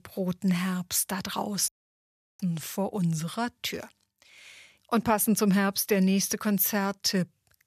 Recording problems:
audio cutting out; at 1.5 s for 0.5 s

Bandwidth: 14.5 kHz